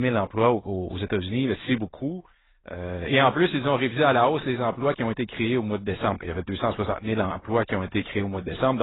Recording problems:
garbled, watery; badly; nothing above 4 kHz
abrupt cut into speech; at the start and the end

